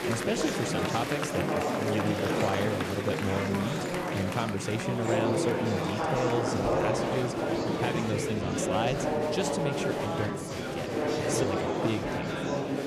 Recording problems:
murmuring crowd; very loud; throughout; 3 dB above the speech

